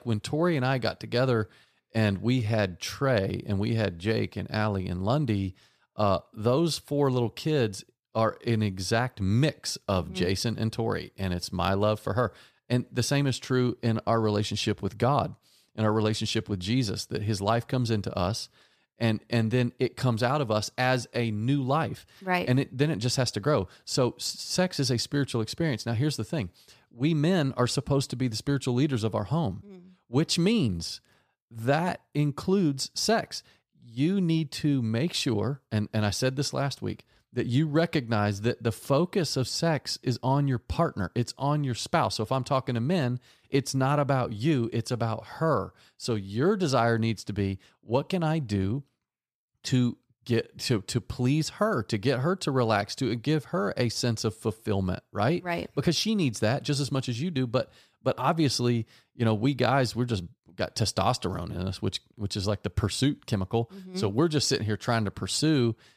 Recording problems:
none

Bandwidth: 15 kHz